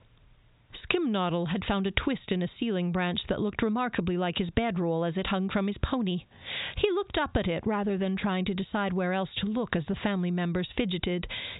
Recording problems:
high frequencies cut off; severe; nothing above 4 kHz
squashed, flat; heavily

